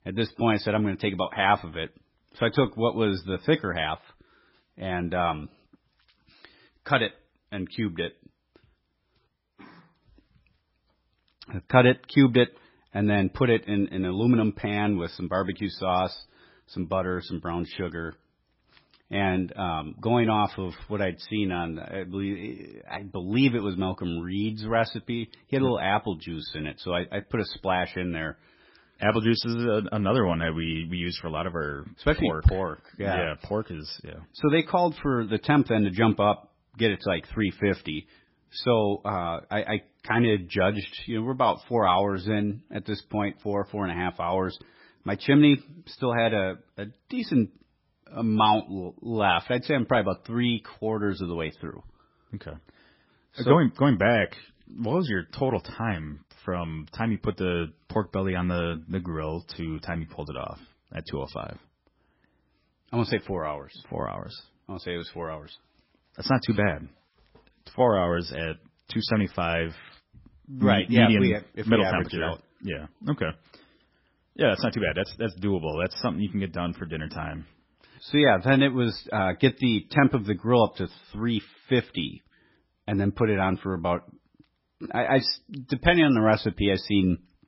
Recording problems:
garbled, watery; badly; nothing above 5.5 kHz

